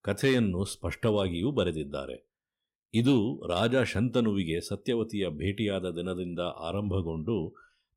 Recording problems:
none

